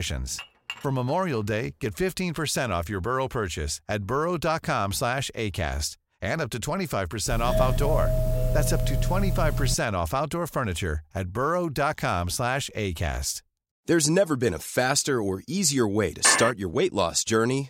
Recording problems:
abrupt cut into speech; at the start
clattering dishes; faint; at 0.5 s; peak 10 dB below the speech
doorbell; loud; from 7.5 to 10 s; peak 1 dB above the speech
clattering dishes; loud; at 16 s; peak 5 dB above the speech

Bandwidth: 16 kHz